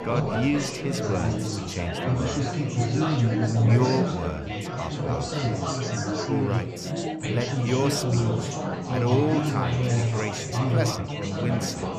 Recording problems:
chatter from many people; very loud; throughout; 4 dB above the speech

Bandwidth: 14.5 kHz